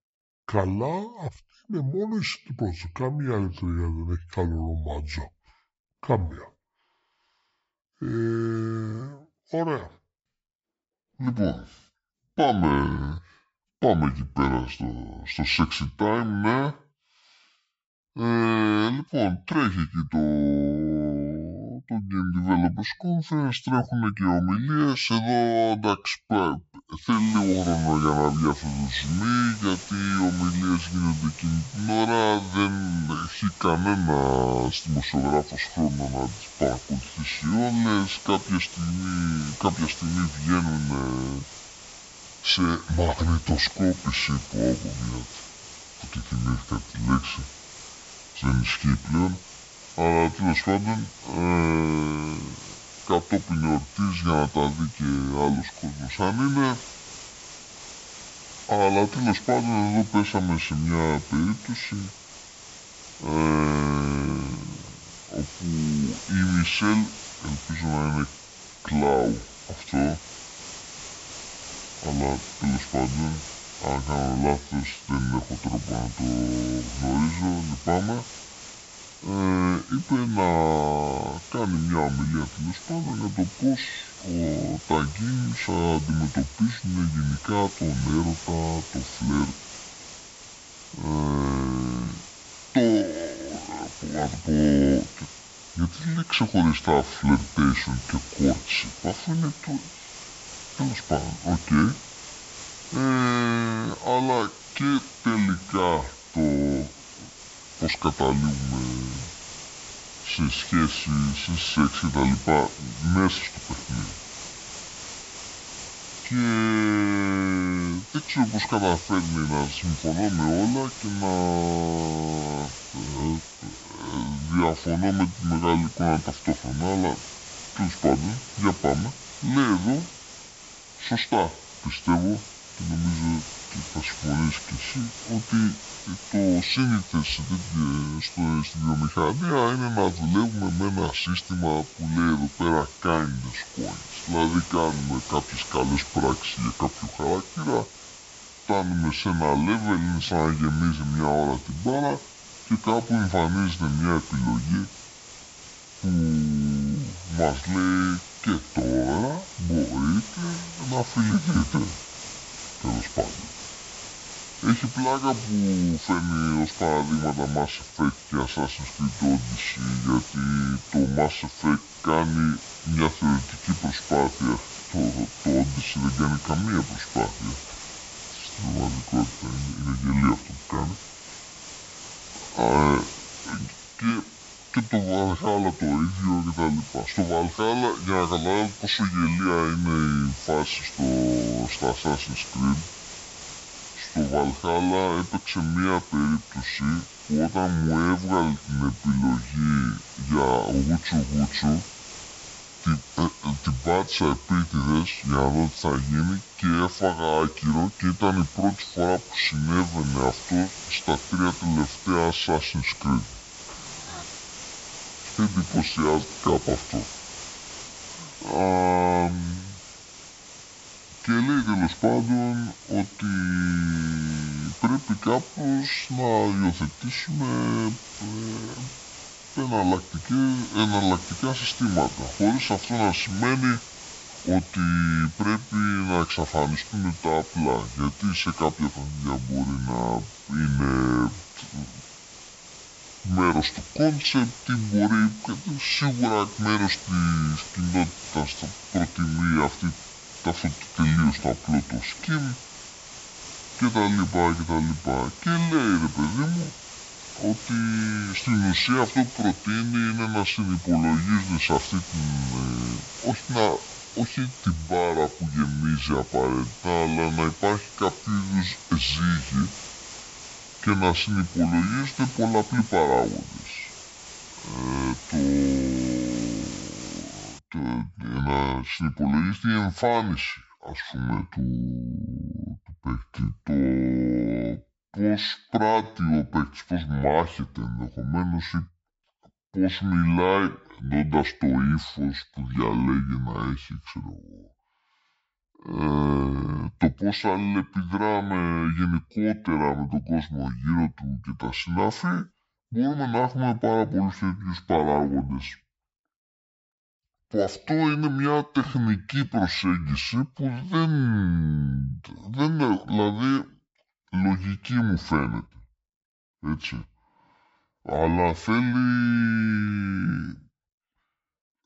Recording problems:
wrong speed and pitch; too slow and too low; 0.6 times normal speed
high frequencies cut off; noticeable; nothing above 7.5 kHz
hiss; noticeable; from 27 s to 4:38; 15 dB below the speech

